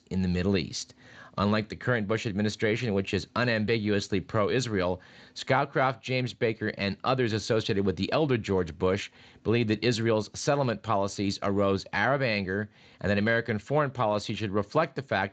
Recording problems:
garbled, watery; slightly; nothing above 7.5 kHz

